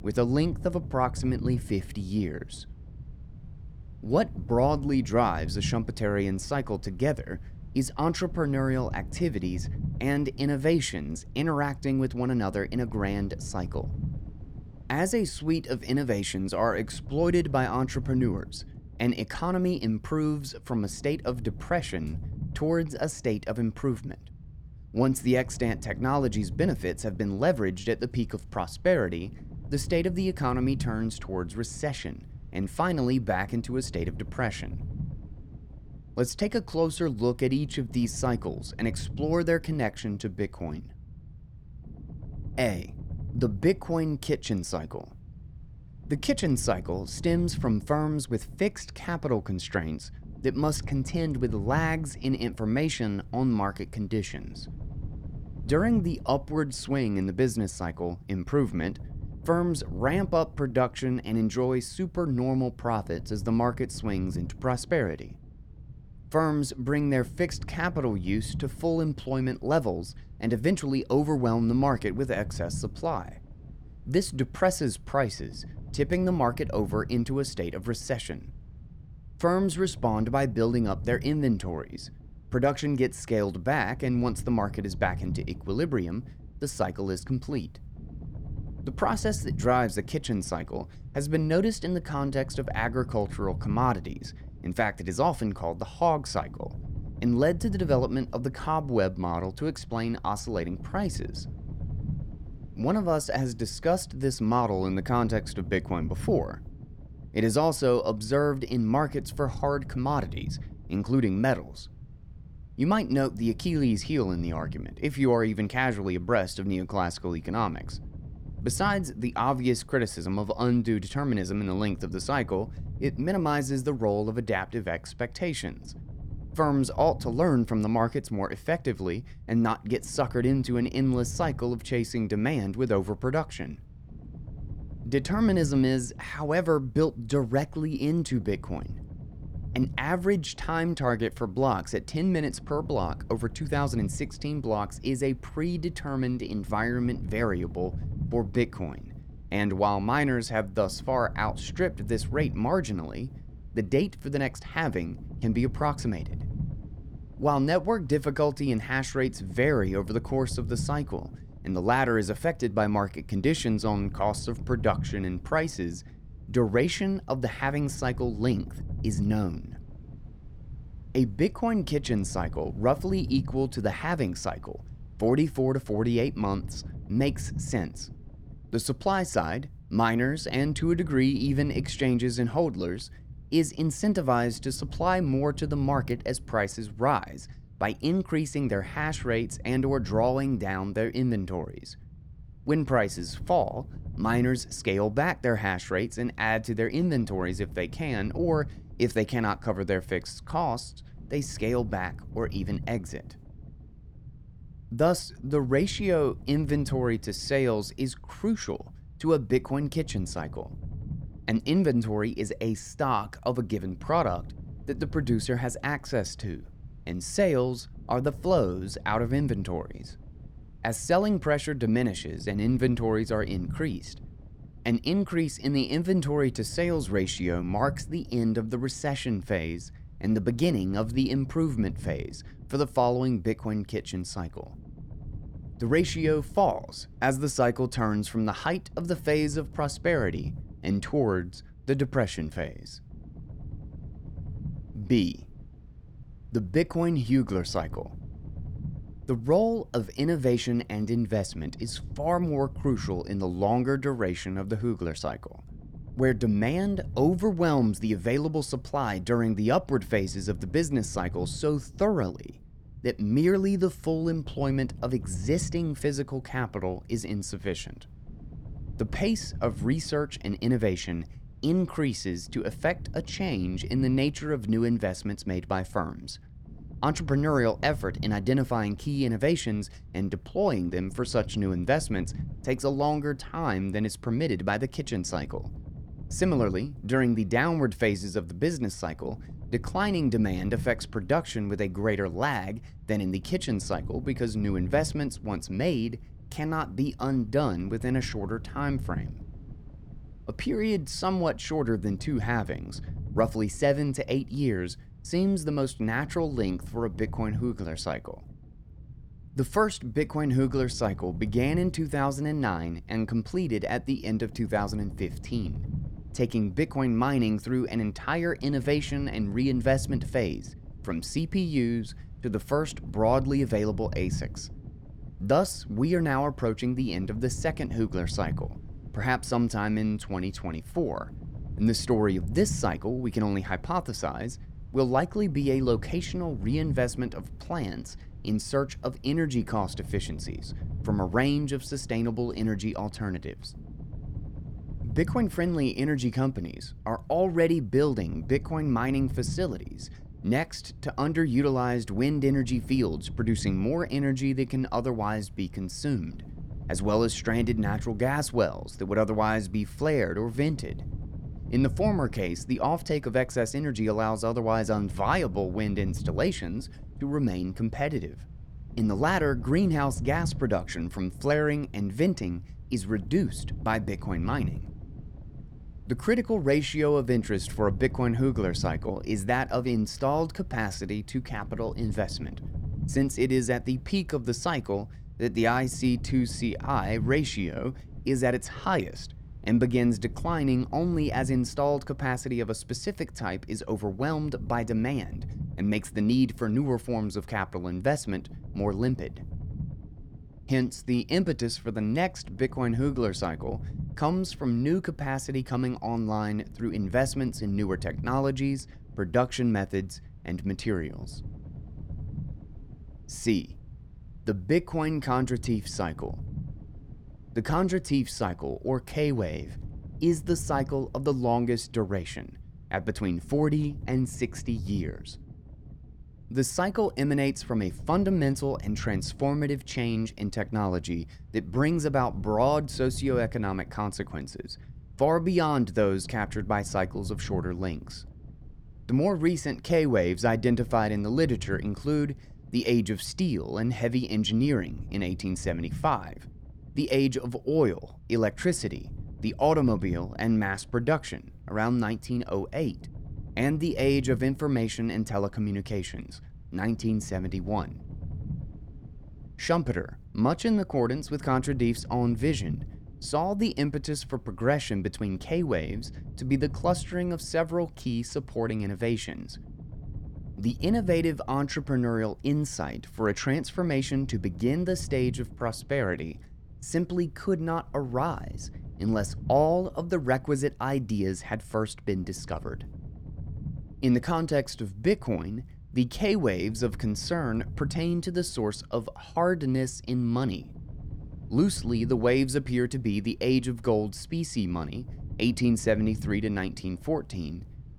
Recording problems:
low rumble; faint; throughout; 25 dB below the speech

